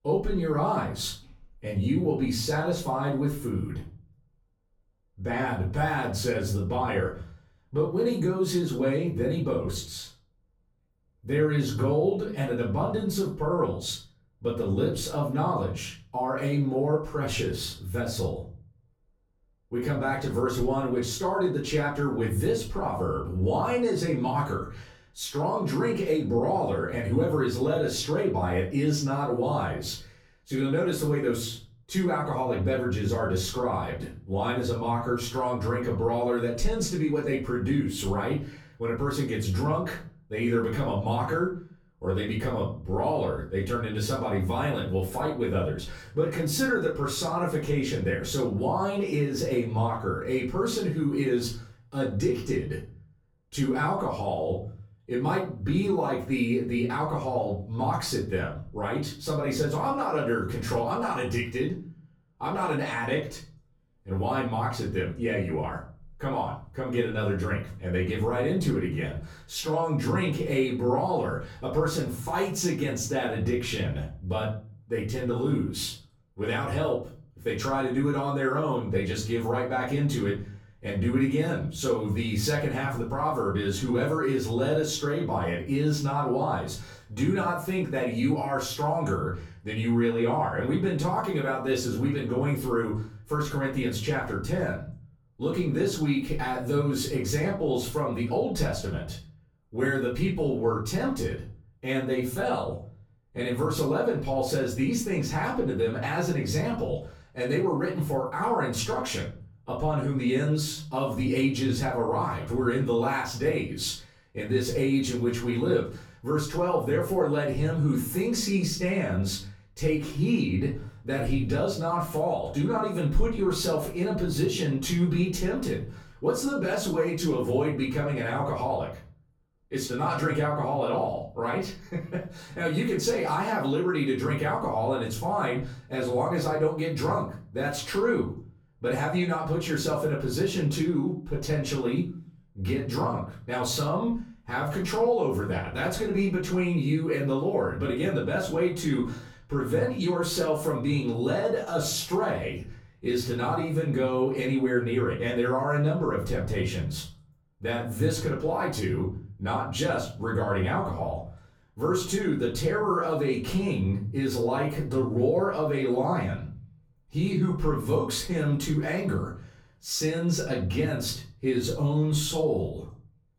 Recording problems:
off-mic speech; far
room echo; slight; dies away in 0.4 s

